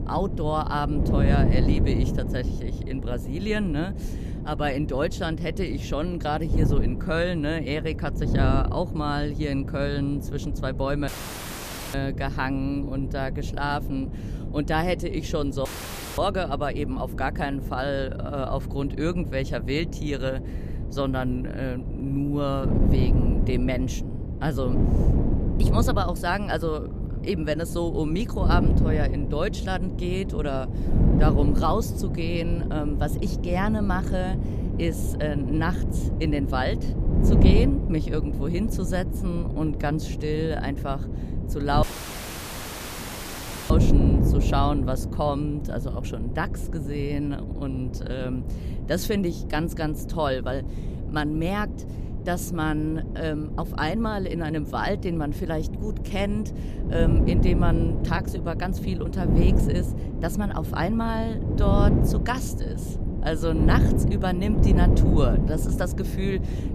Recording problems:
wind noise on the microphone; heavy; 7 dB below the speech
audio cutting out; at 11 s for 1 s, at 16 s for 0.5 s and at 42 s for 2 s

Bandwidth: 14.5 kHz